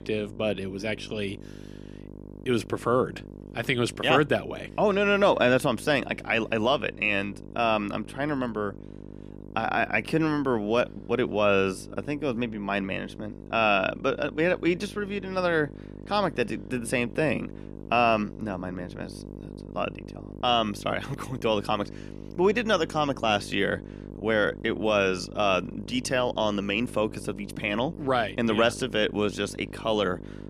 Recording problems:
electrical hum; faint; throughout; 50 Hz, 20 dB below the speech

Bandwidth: 14.5 kHz